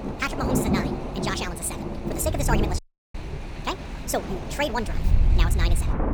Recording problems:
wrong speed and pitch; too fast and too high; 1.5 times normal speed
rain or running water; loud; throughout; 1 dB below the speech
train or aircraft noise; noticeable; throughout; 20 dB below the speech
wind noise on the microphone; occasional gusts; 15 dB below the speech
audio cutting out; at 3 s

